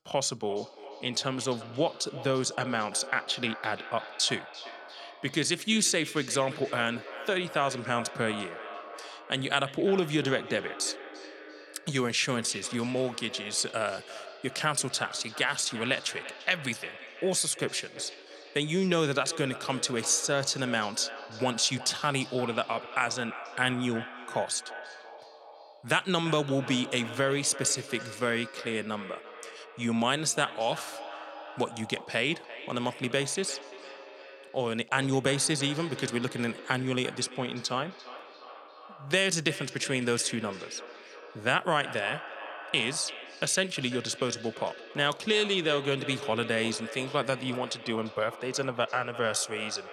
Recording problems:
echo of what is said; noticeable; throughout; 340 ms later, 15 dB below the speech

